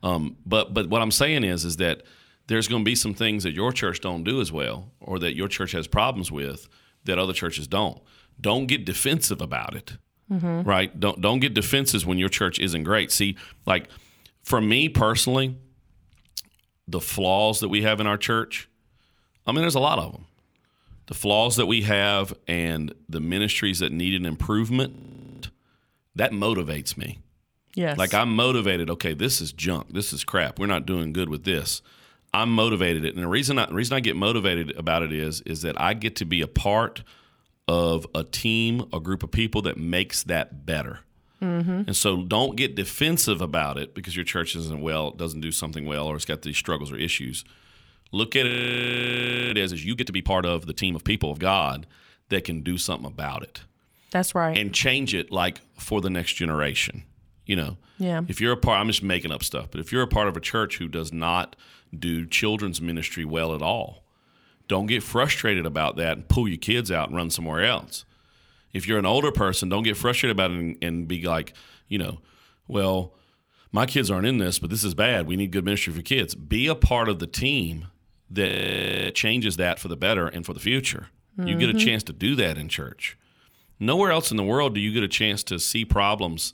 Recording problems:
audio freezing; at 25 s, at 48 s for 1 s and at 1:18 for 0.5 s

